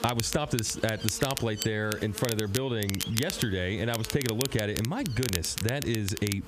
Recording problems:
squashed, flat; heavily
crackle, like an old record; loud; 6 dB below the speech
electrical hum; noticeable; throughout; 50 Hz, 15 dB below the speech

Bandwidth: 14.5 kHz